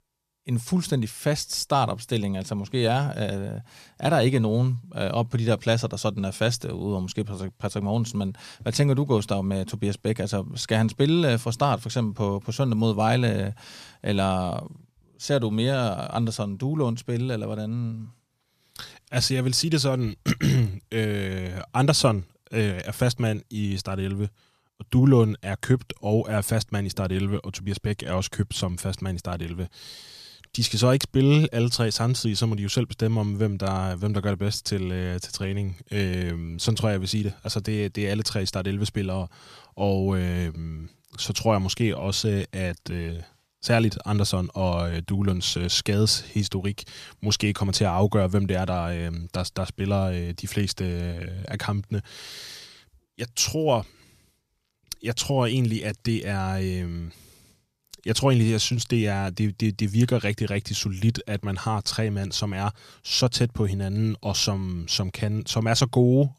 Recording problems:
none

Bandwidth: 14.5 kHz